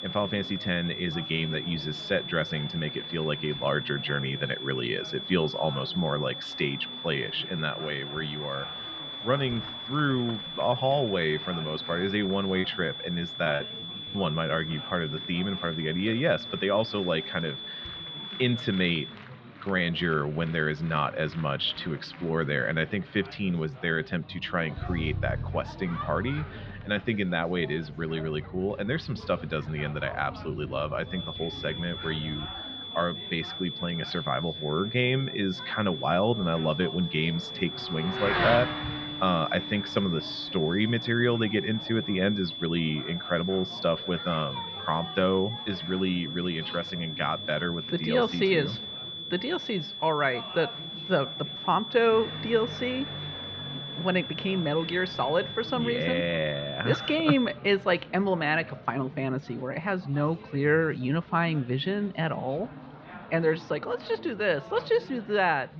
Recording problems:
muffled; slightly; fading above 4 kHz
high-pitched whine; loud; until 19 s and from 31 to 58 s; 3.5 kHz, 7 dB below the speech
traffic noise; noticeable; throughout; 10 dB below the speech
chatter from many people; noticeable; throughout; 15 dB below the speech
choppy; very; from 13 to 14 s; 11% of the speech affected

